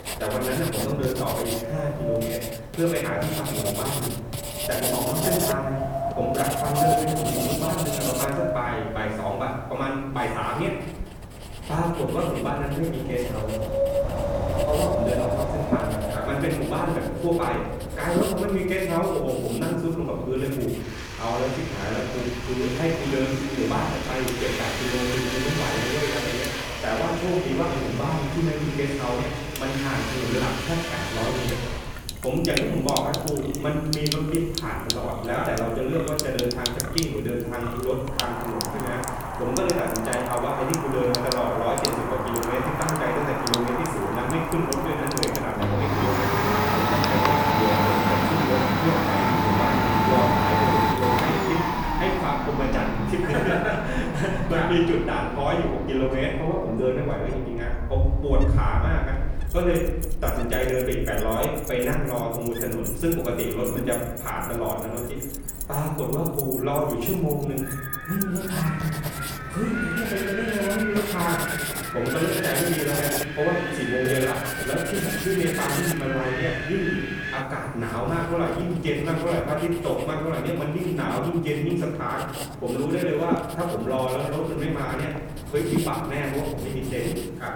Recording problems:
off-mic speech; far
room echo; noticeable; dies away in 0.9 s
household noises; loud; throughout; 2 dB below the speech
wind in the background; loud; throughout; 6 dB below the speech

